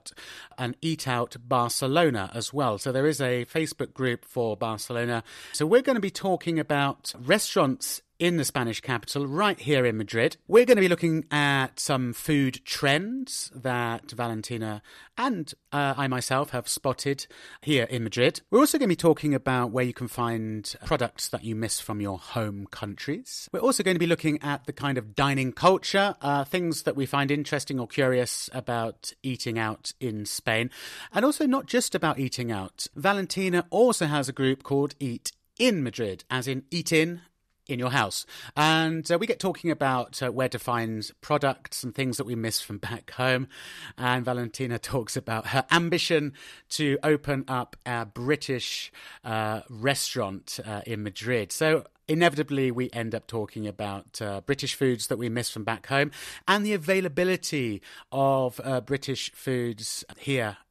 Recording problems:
none

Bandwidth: 13.5 kHz